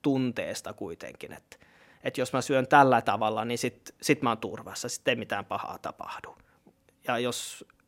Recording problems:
none

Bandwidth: 16 kHz